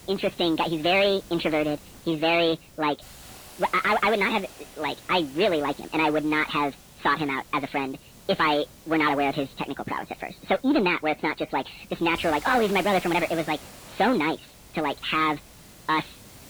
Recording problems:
high frequencies cut off; severe; nothing above 4.5 kHz
wrong speed and pitch; too fast and too high; 1.5 times normal speed
distortion; slight; 10 dB below the speech
garbled, watery; slightly
hiss; faint; throughout; 20 dB below the speech

